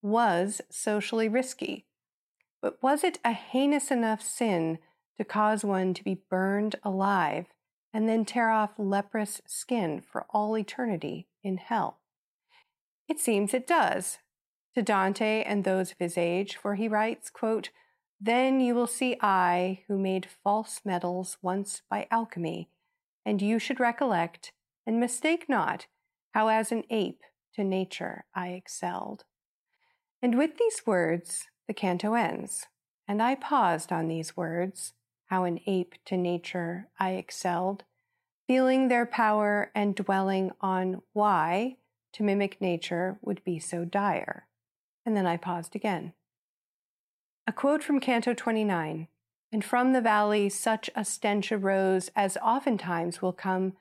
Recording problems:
none

